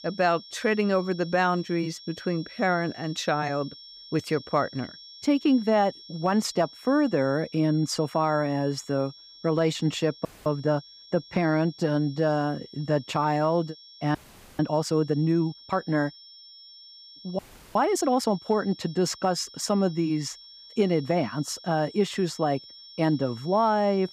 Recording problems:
high-pitched whine; noticeable; throughout; 5.5 kHz, 20 dB below the speech
audio freezing; at 10 s, at 14 s and at 17 s

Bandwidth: 15 kHz